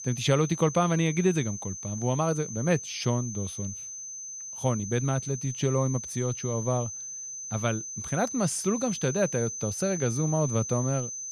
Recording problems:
high-pitched whine; loud; throughout; 6 kHz, 7 dB below the speech

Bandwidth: 15 kHz